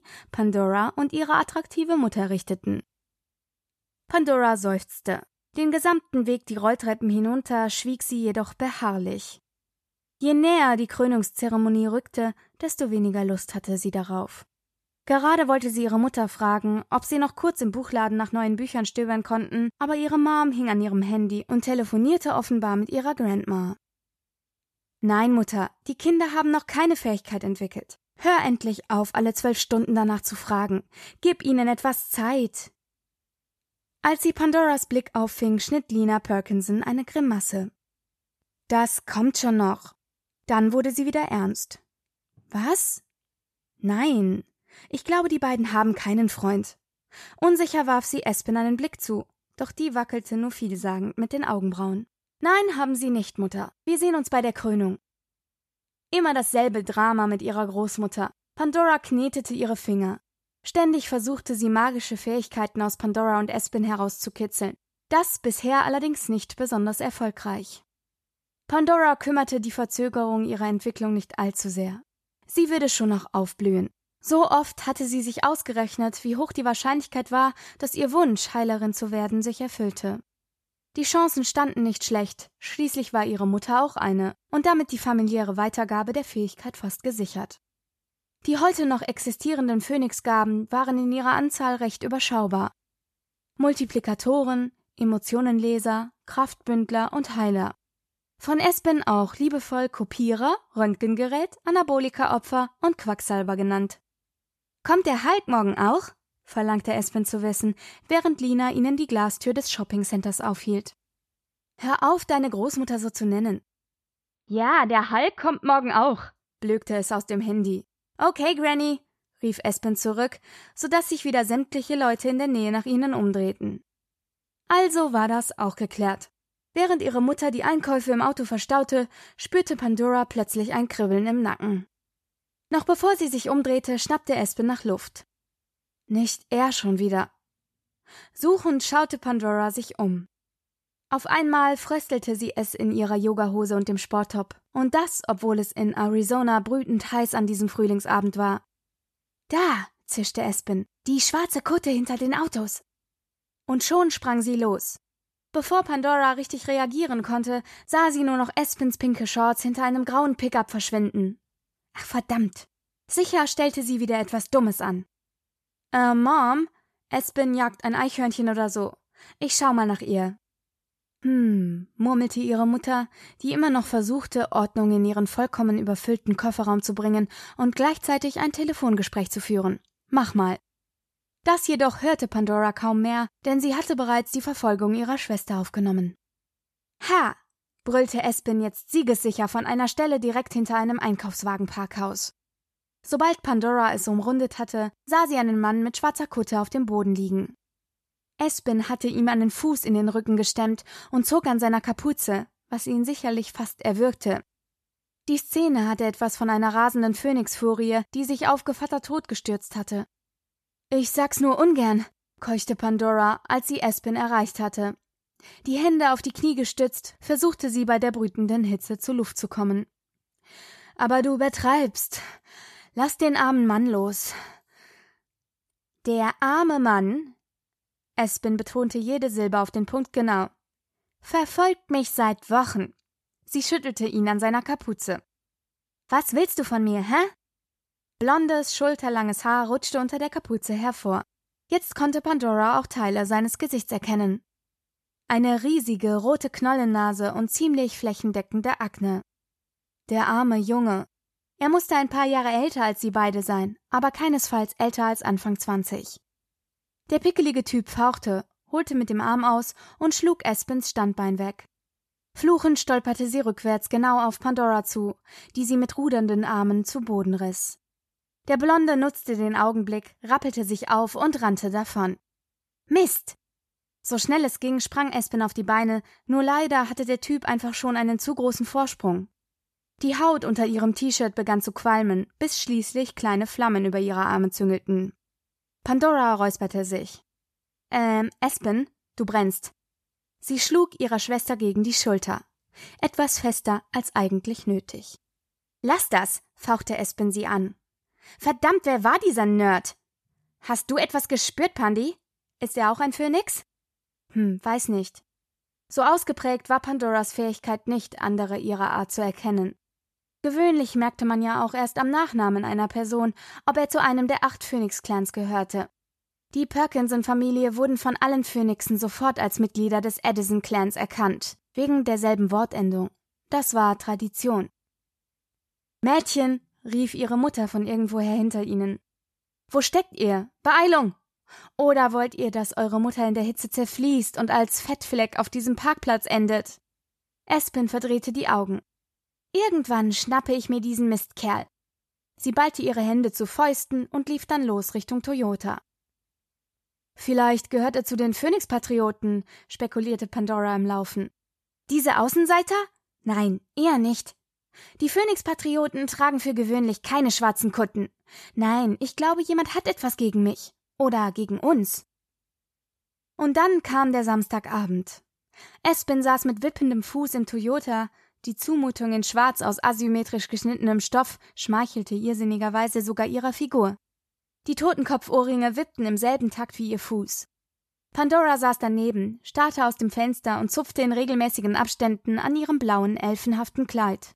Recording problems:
none

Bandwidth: 13.5 kHz